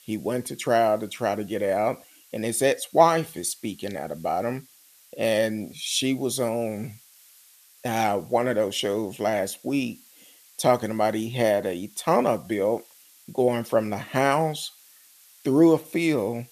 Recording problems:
hiss; faint; throughout; 25 dB below the speech

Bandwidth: 14.5 kHz